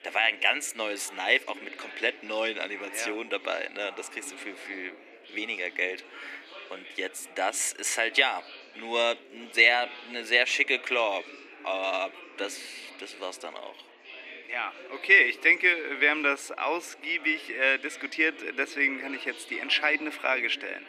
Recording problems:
thin; somewhat; fading below 300 Hz
chatter from many people; noticeable; throughout; 20 dB below the speech

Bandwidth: 14.5 kHz